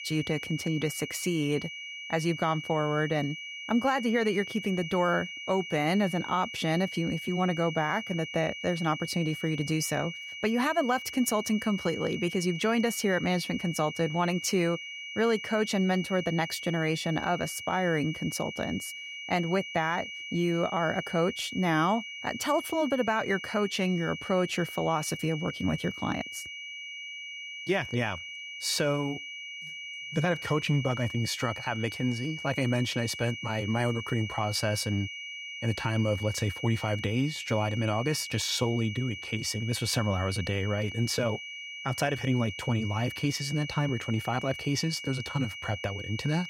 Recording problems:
high-pitched whine; loud; throughout; 2.5 kHz, 8 dB below the speech

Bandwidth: 16.5 kHz